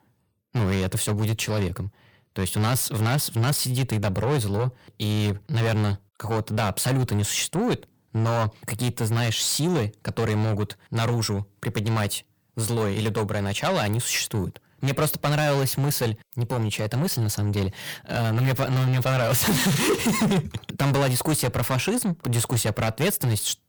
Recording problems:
distortion; heavy; 6 dB below the speech

